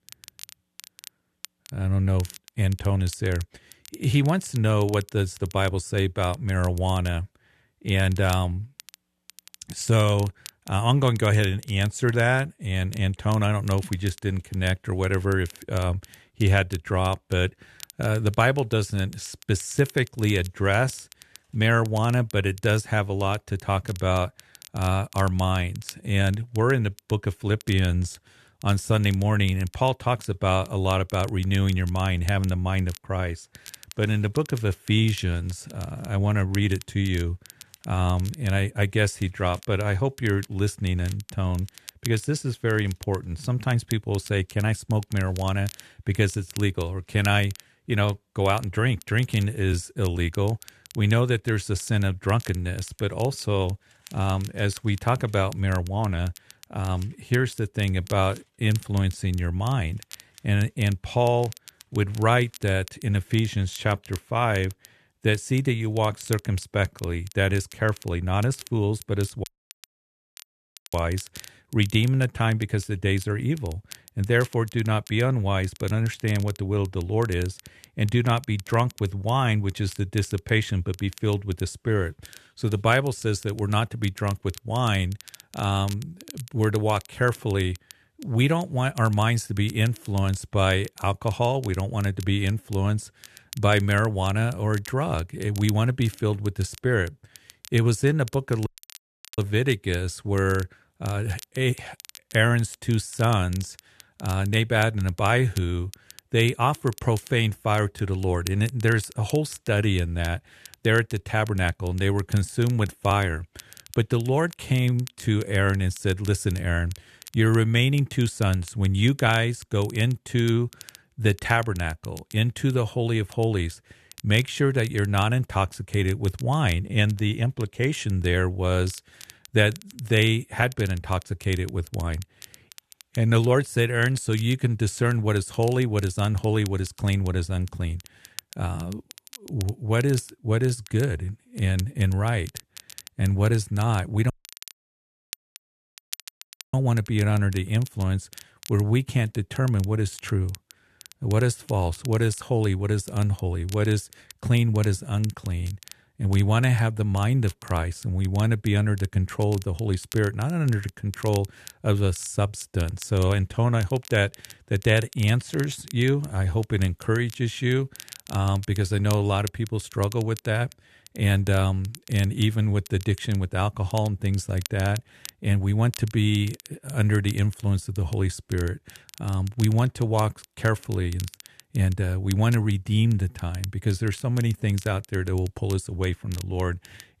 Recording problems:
crackle, like an old record; faint; 20 dB below the speech
audio cutting out; at 1:09 for 1.5 s, at 1:39 for 0.5 s and at 2:24 for 2.5 s

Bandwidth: 13.5 kHz